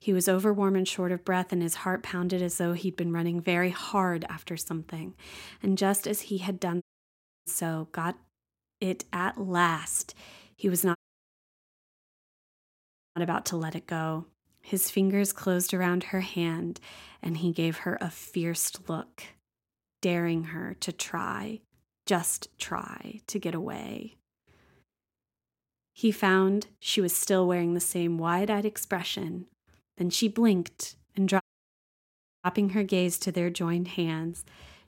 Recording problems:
audio cutting out; at 7 s for 0.5 s, at 11 s for 2 s and at 31 s for 1 s

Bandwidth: 16 kHz